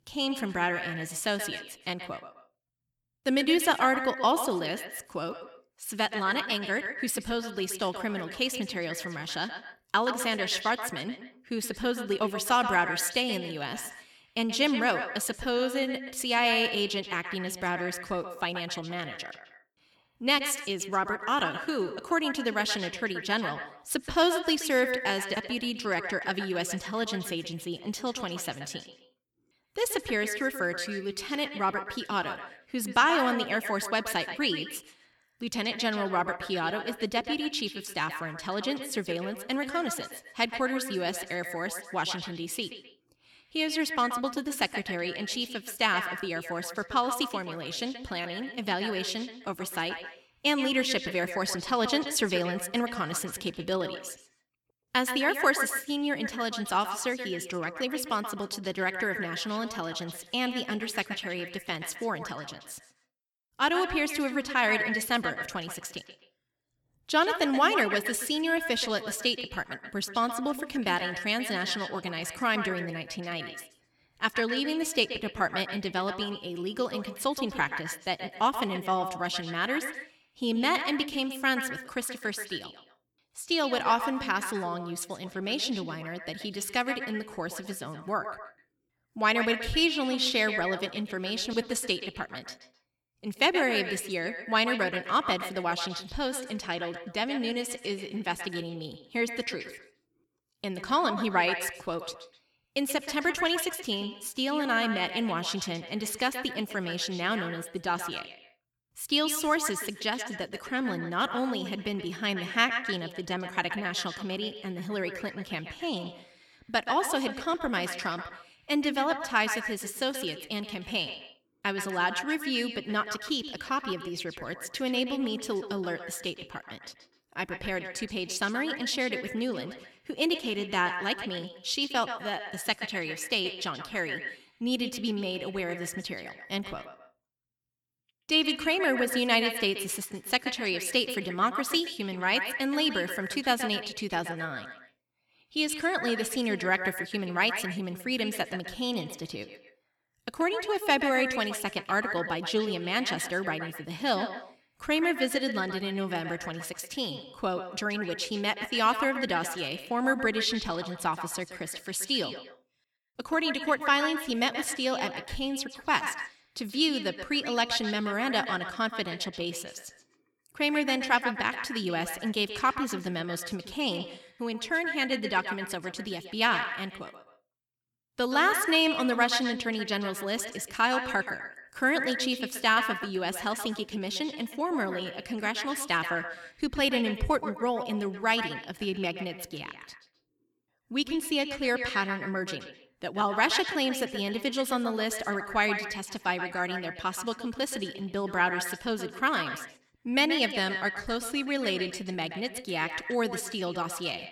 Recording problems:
echo of what is said; strong; throughout; 130 ms later, 8 dB below the speech

